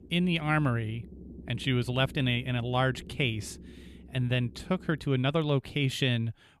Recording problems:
low rumble; faint; until 5 s; 25 dB below the speech

